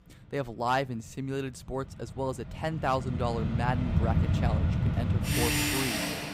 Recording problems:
machinery noise; very loud; throughout; 5 dB above the speech

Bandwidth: 15.5 kHz